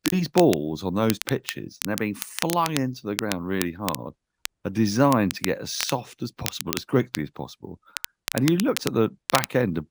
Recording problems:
crackle, like an old record; loud; 8 dB below the speech

